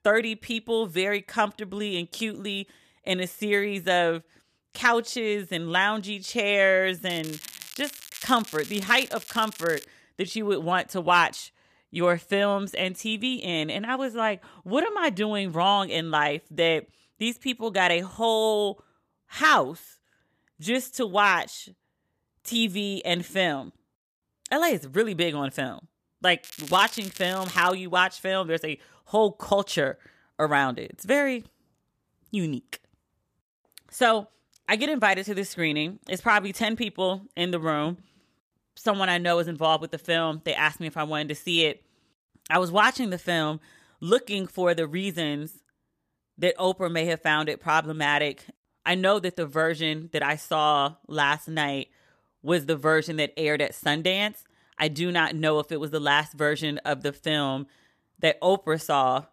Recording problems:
crackling; noticeable; from 7 to 10 s and from 26 to 28 s; 15 dB below the speech

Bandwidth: 14.5 kHz